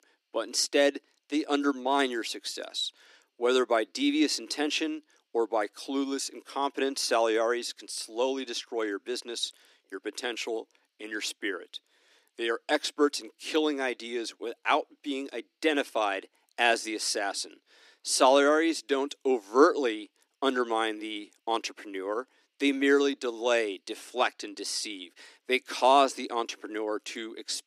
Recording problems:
thin; somewhat; fading below 300 Hz

